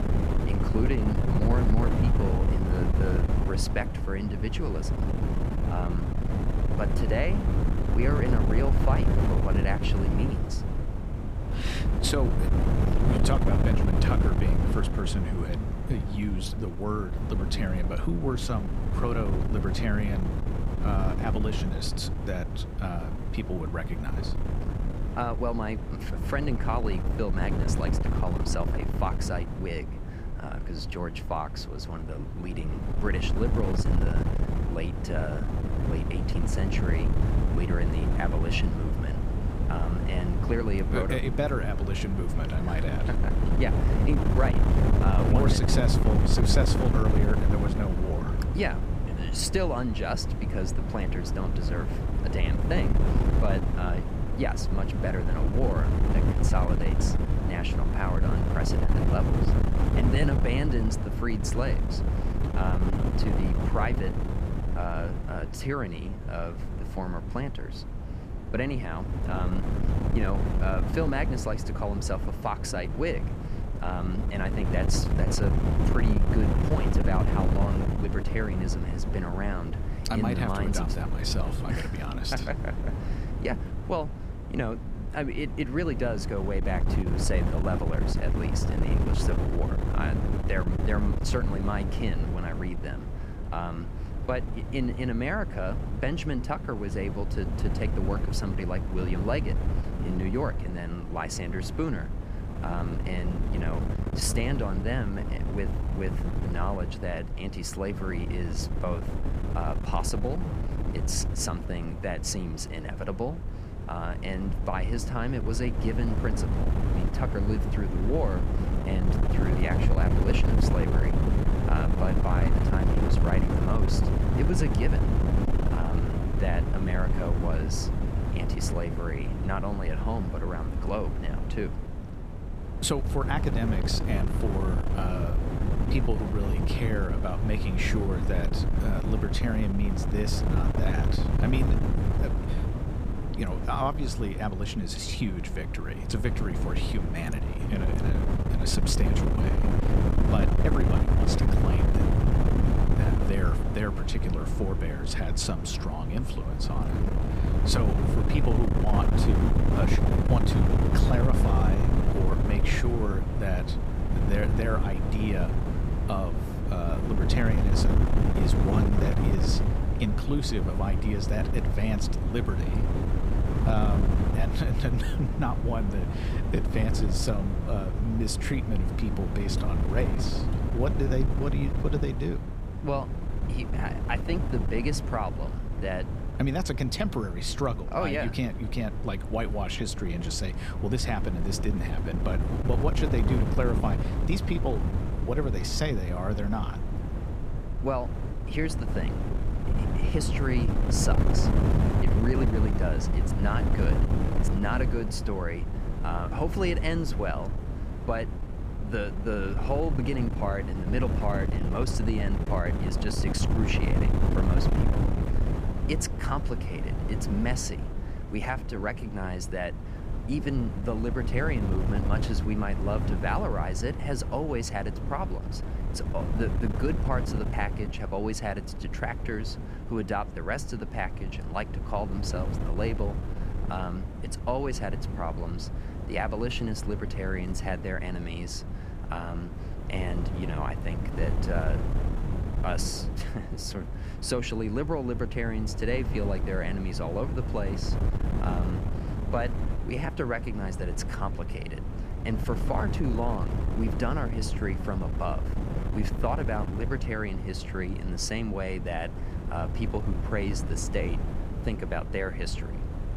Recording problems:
wind noise on the microphone; heavy; 3 dB below the speech

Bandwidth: 15 kHz